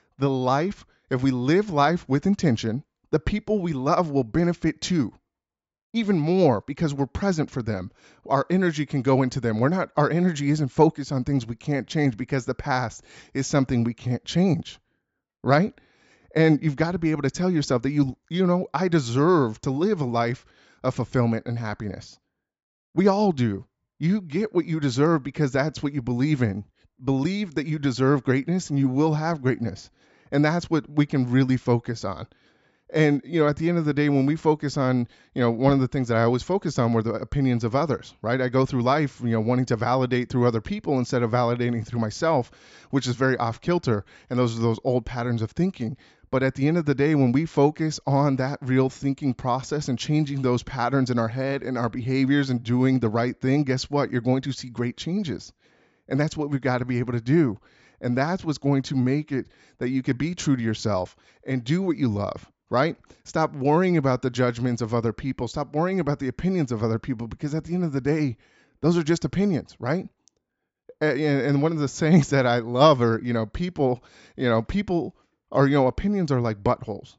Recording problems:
high frequencies cut off; noticeable; nothing above 8 kHz

